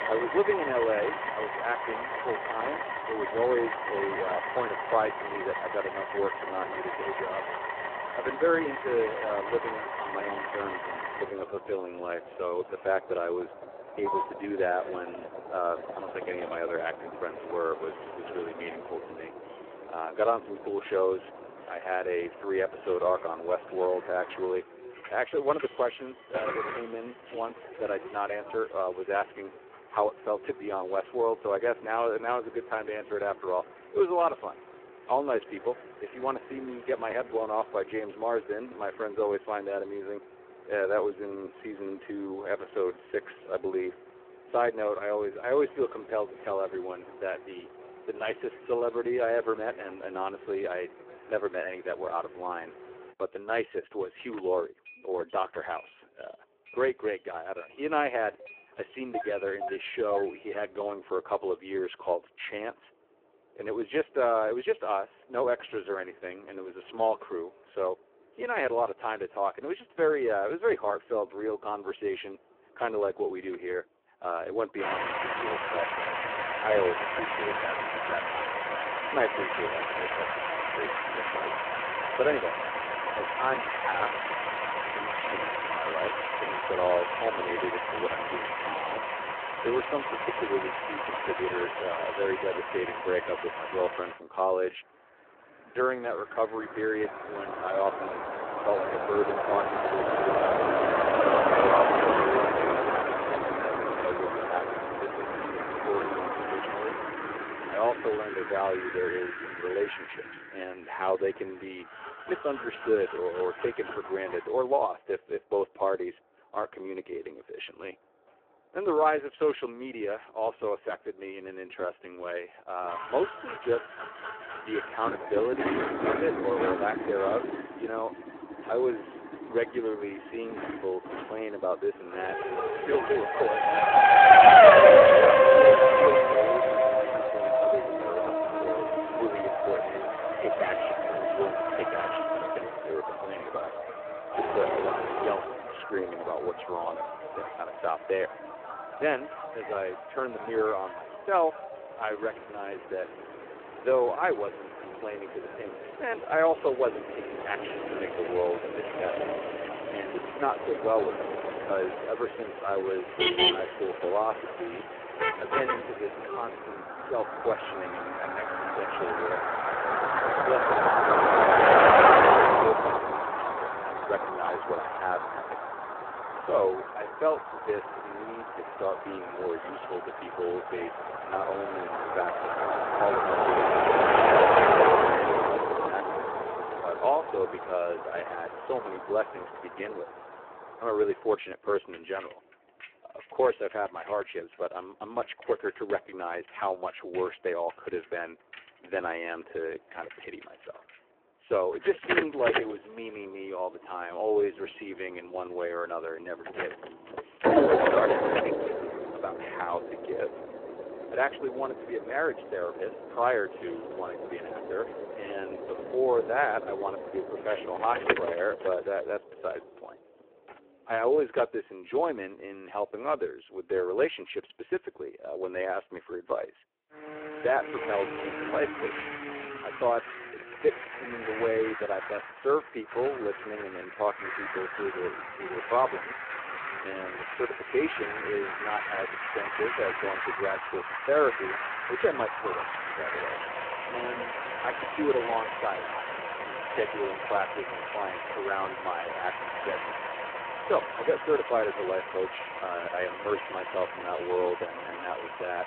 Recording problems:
phone-call audio; poor line
traffic noise; very loud; throughout; 5 dB above the speech

